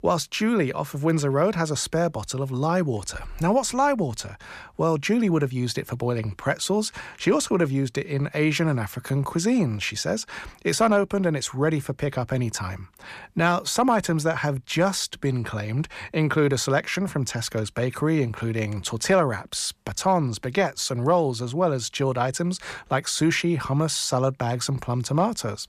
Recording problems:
none

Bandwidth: 14.5 kHz